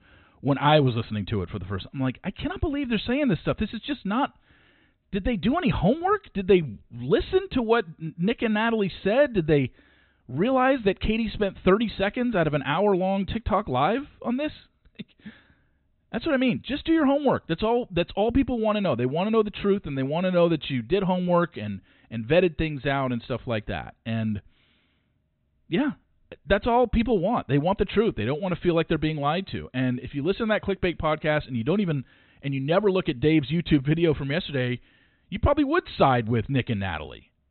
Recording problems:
high frequencies cut off; severe; nothing above 4 kHz

